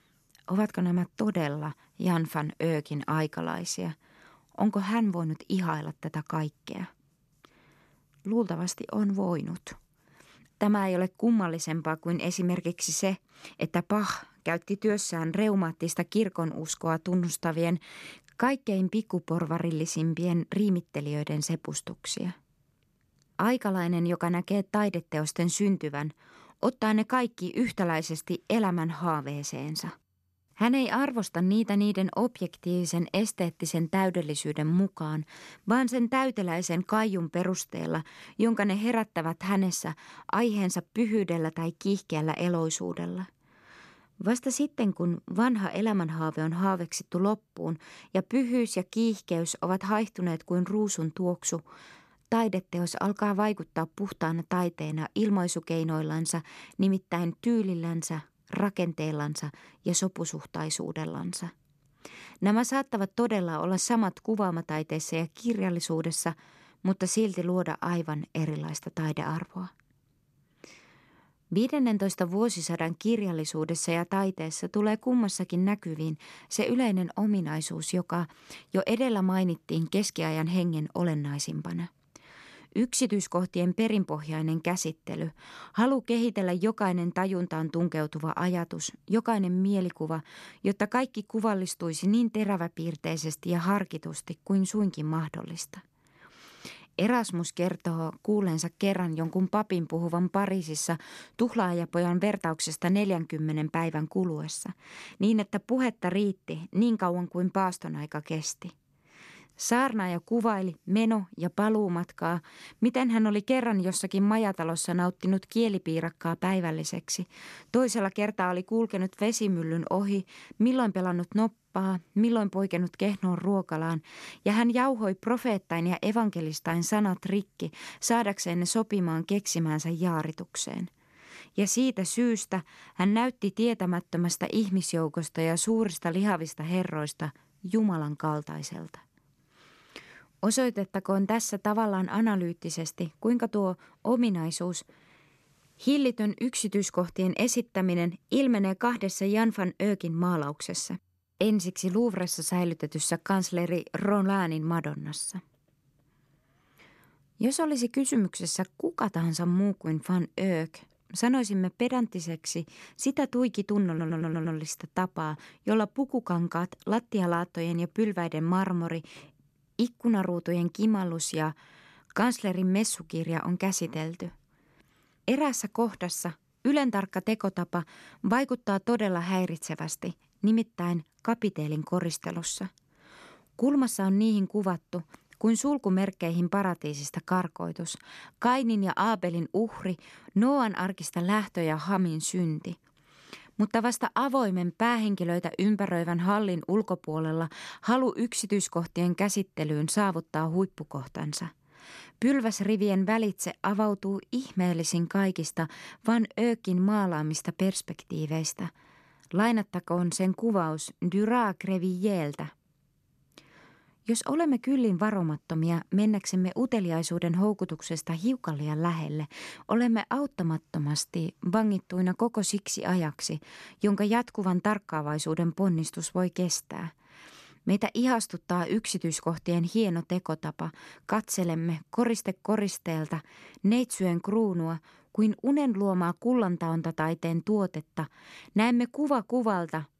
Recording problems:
audio stuttering; at 2:44

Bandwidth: 13.5 kHz